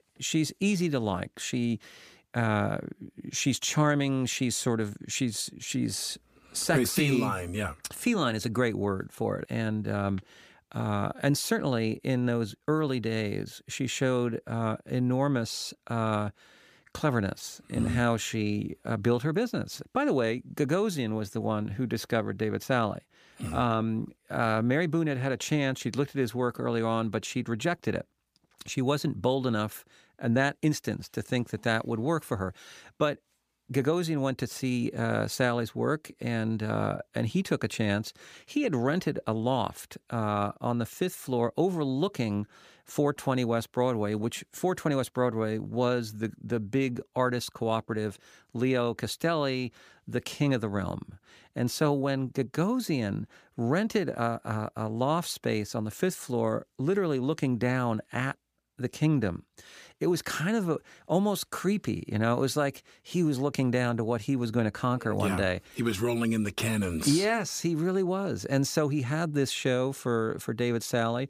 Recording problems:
none

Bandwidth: 15 kHz